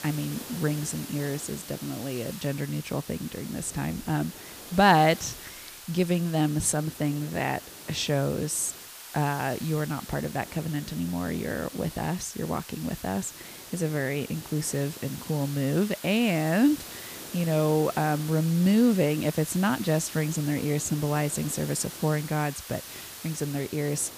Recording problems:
hiss; noticeable; throughout; 10 dB below the speech

